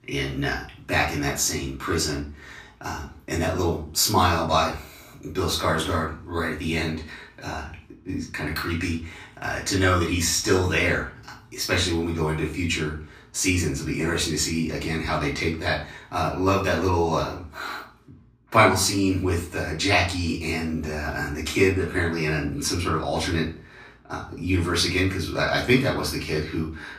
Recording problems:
off-mic speech; far
room echo; slight; dies away in 0.3 s

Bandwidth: 15 kHz